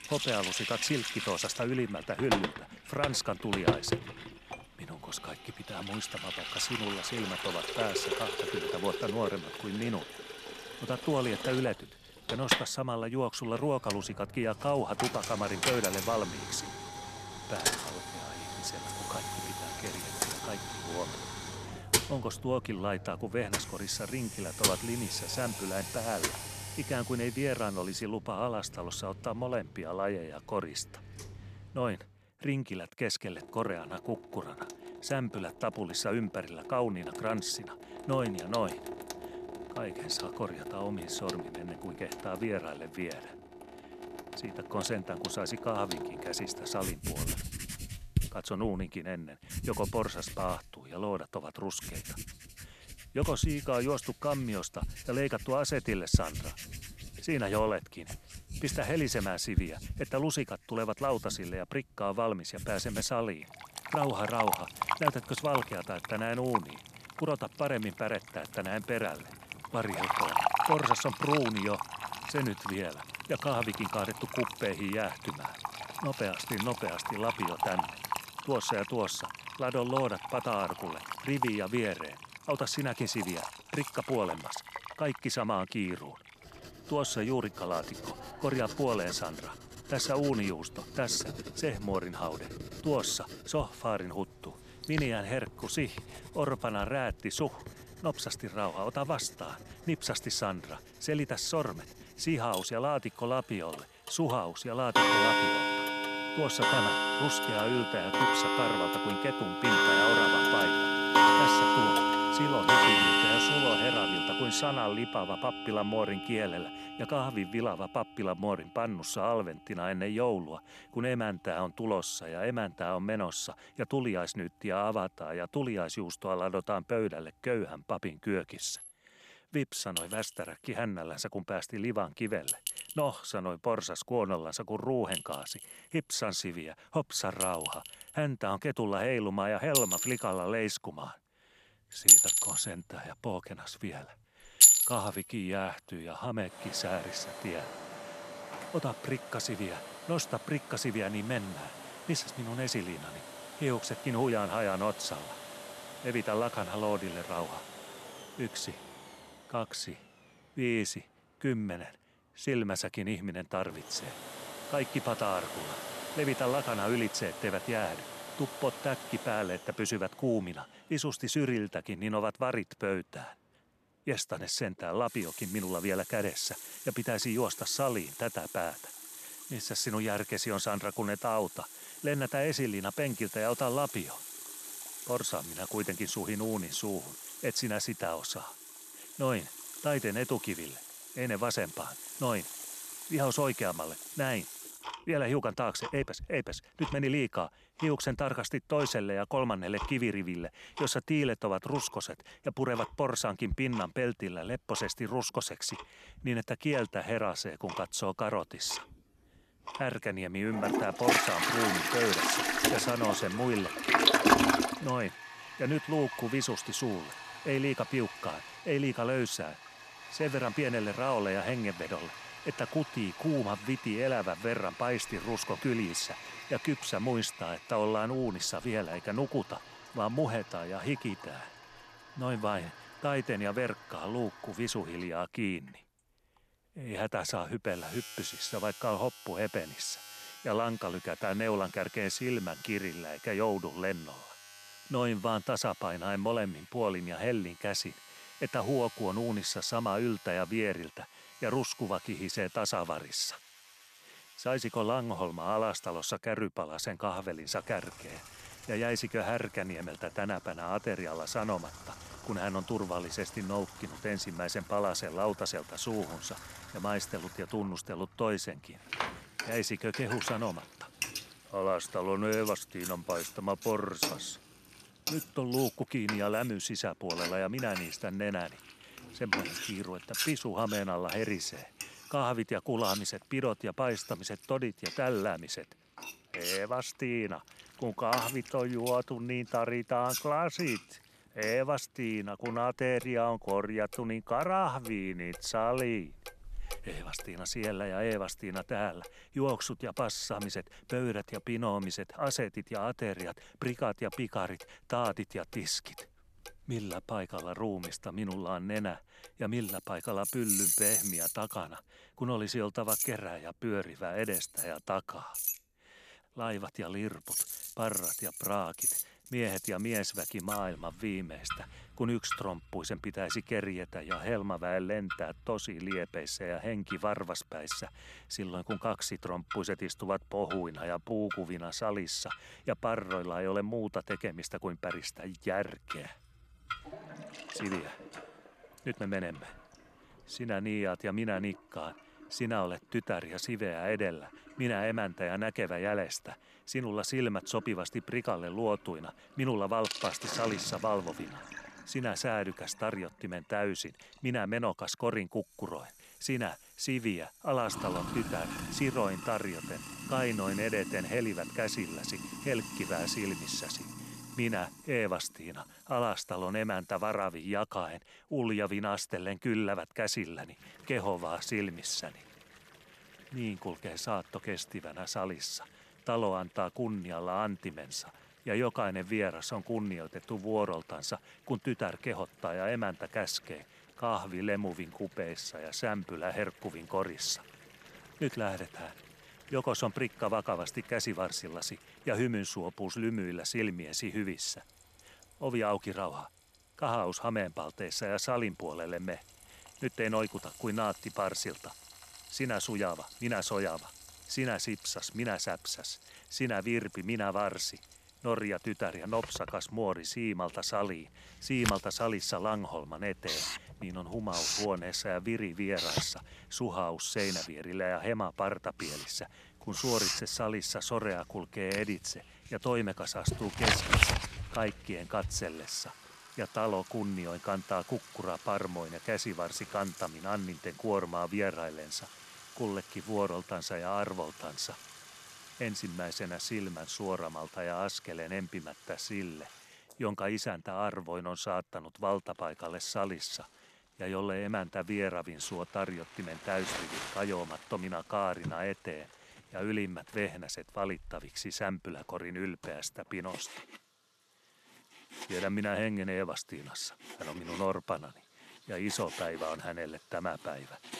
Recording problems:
household noises; very loud; throughout; 1 dB above the speech

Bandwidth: 14 kHz